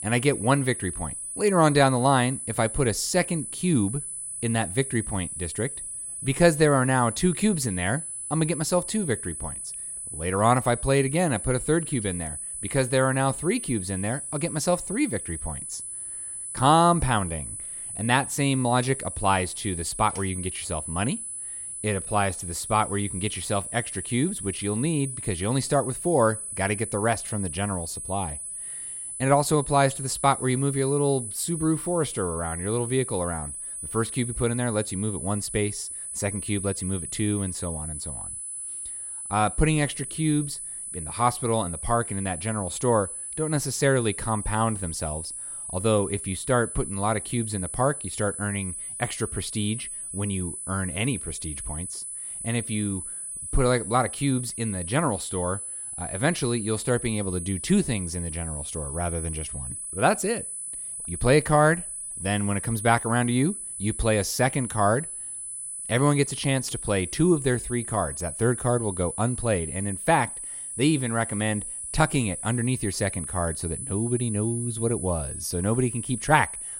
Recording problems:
high-pitched whine; loud; throughout; 10 kHz, 6 dB below the speech

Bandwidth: 16 kHz